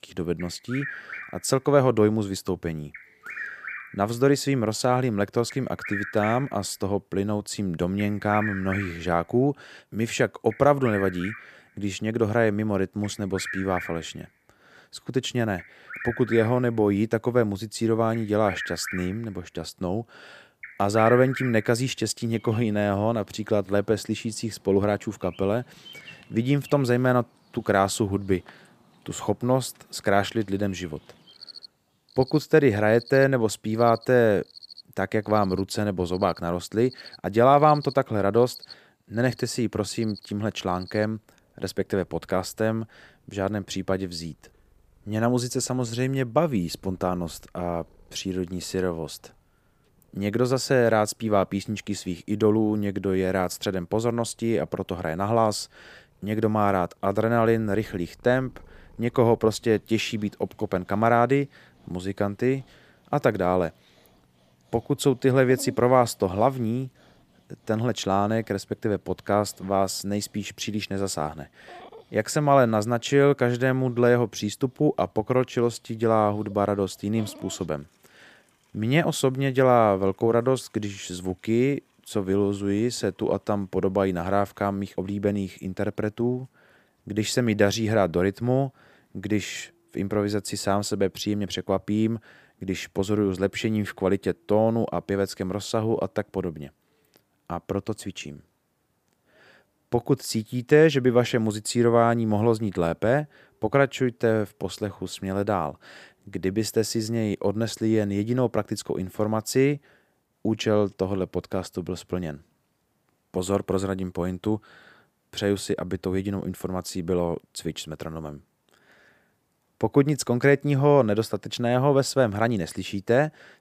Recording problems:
animal sounds; noticeable; throughout; 15 dB below the speech

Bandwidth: 15 kHz